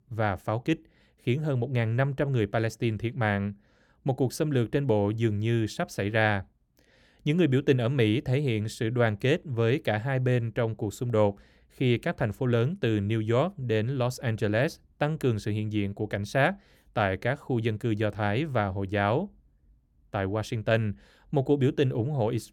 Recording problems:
none

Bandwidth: 17.5 kHz